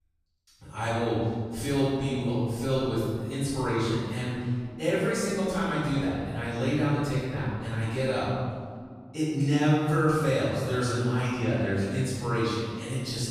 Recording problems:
room echo; strong; dies away in 1.8 s
off-mic speech; far

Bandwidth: 14.5 kHz